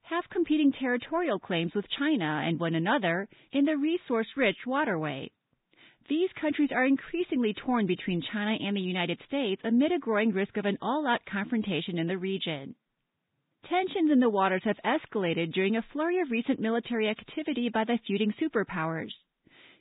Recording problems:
garbled, watery; badly
high frequencies cut off; severe; nothing above 3.5 kHz

